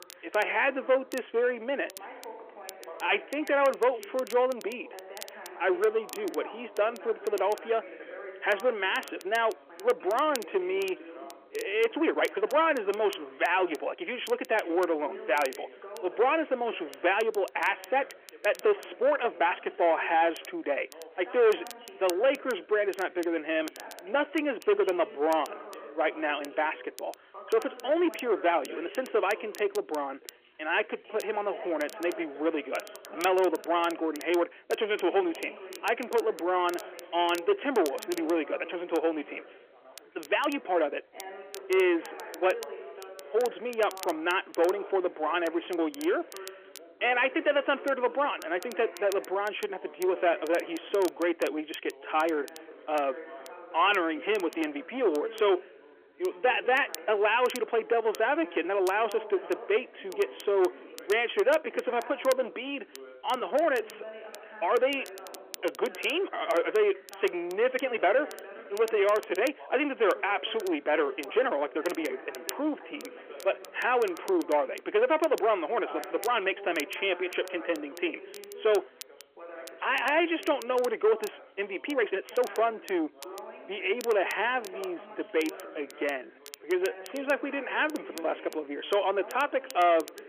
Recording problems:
phone-call audio; nothing above 3 kHz
distortion; slight; 10 dB below the speech
background chatter; noticeable; throughout; 2 voices, 15 dB below the speech
crackle, like an old record; noticeable; 20 dB below the speech
uneven, jittery; strongly; from 12 s to 1:27

